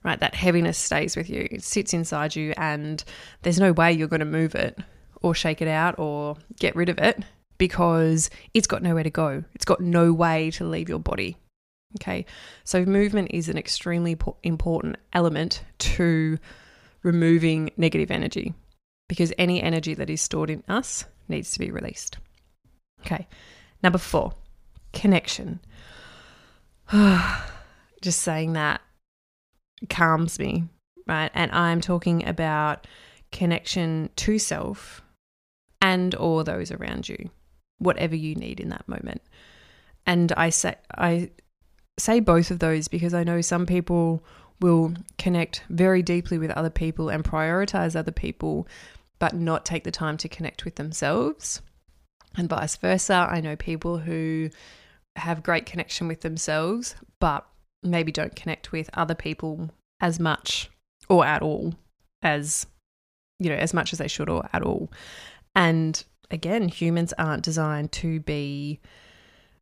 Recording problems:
none

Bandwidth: 15 kHz